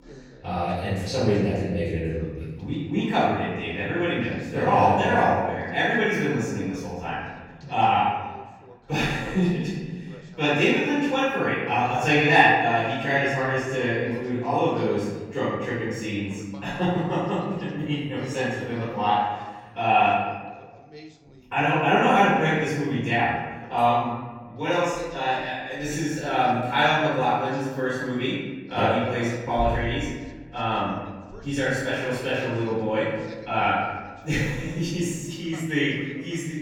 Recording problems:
room echo; strong; dies away in 1.3 s
off-mic speech; far
voice in the background; faint; throughout; 25 dB below the speech

